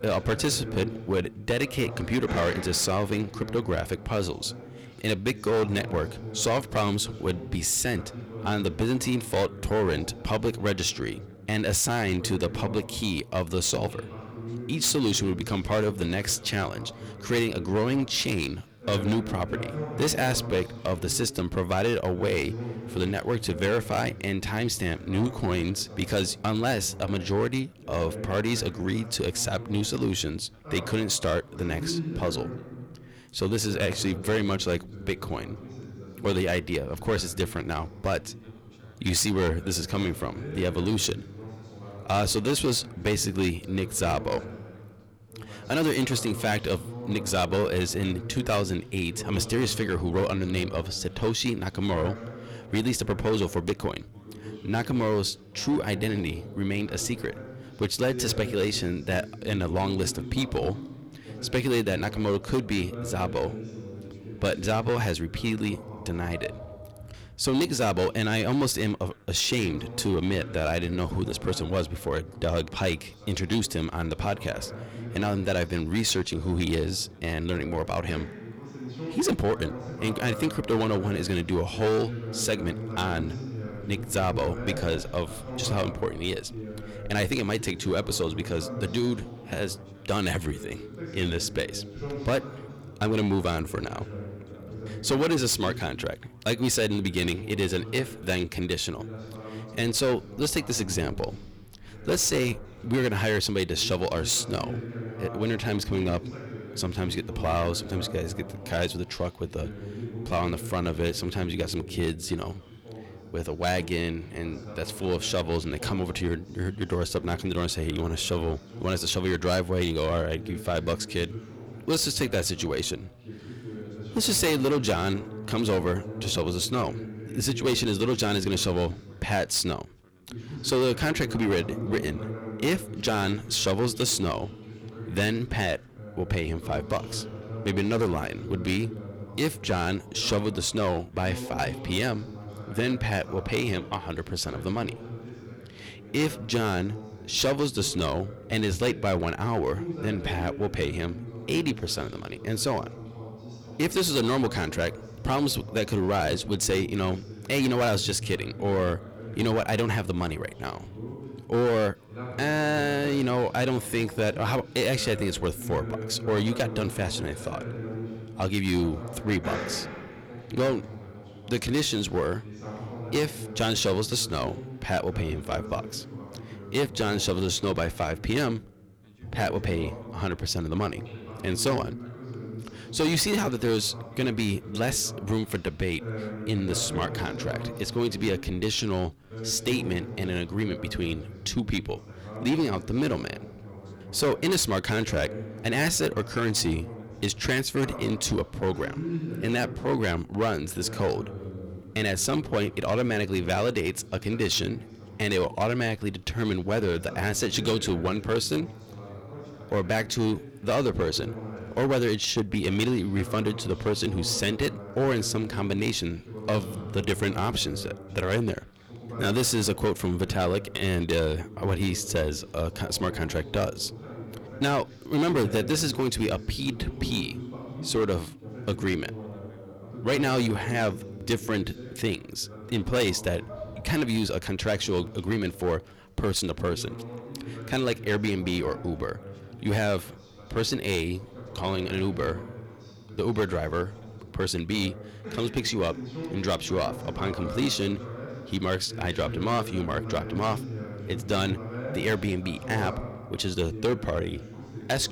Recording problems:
distortion; slight; 6% of the sound clipped
background chatter; noticeable; throughout; 2 voices, 10 dB below the speech

